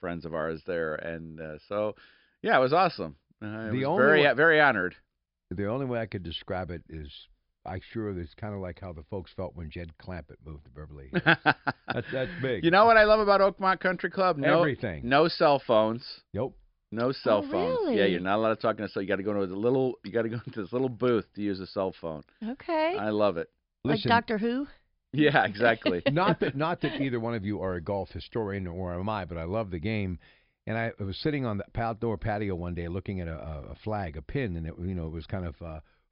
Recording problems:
high frequencies cut off; noticeable; nothing above 5.5 kHz

